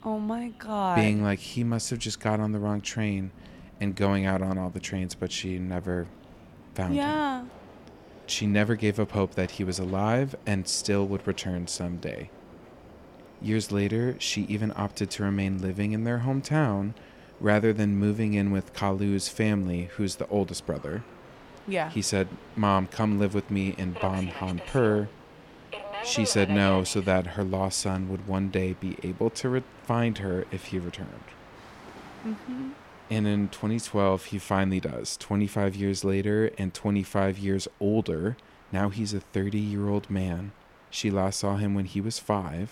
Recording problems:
train or aircraft noise; noticeable; throughout; 20 dB below the speech

